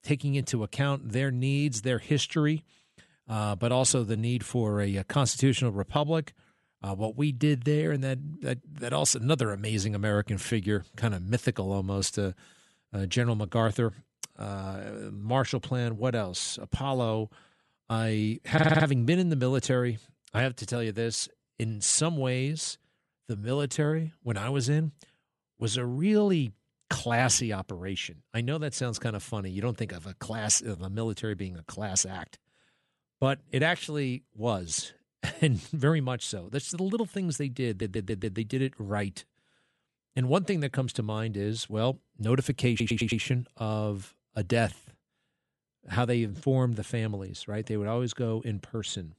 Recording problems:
audio stuttering; at 19 s, at 38 s and at 43 s

